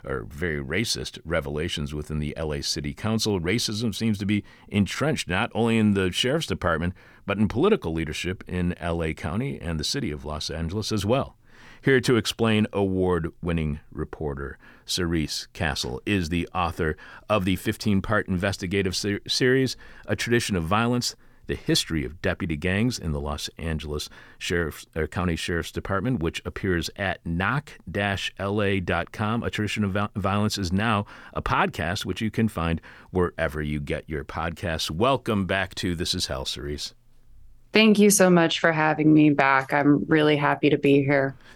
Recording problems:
none

